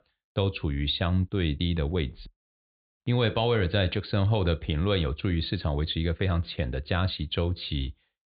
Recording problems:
high frequencies cut off; severe; nothing above 4 kHz

